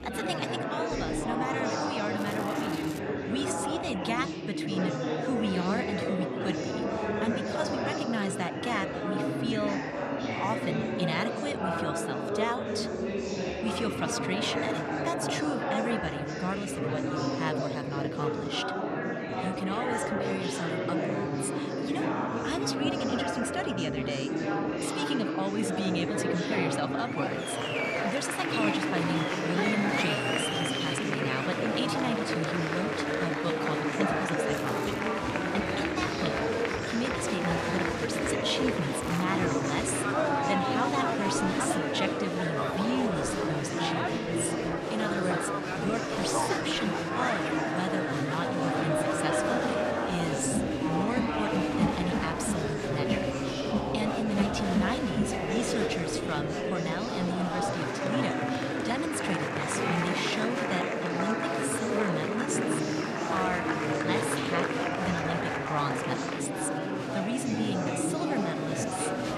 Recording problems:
murmuring crowd; very loud; throughout; 4 dB above the speech
crackling; noticeable; at 2 s, at 35 s and at 39 s; 15 dB below the speech

